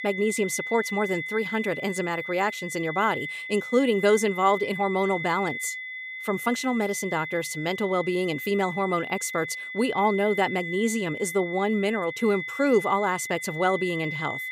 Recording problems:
high-pitched whine; loud; throughout; 2 kHz, 7 dB below the speech

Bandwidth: 15.5 kHz